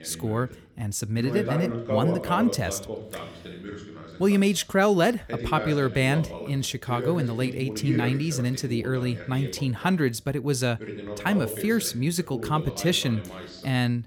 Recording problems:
voice in the background; loud; throughout; 9 dB below the speech

